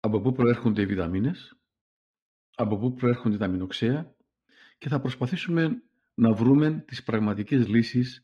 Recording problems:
muffled; slightly; fading above 3 kHz

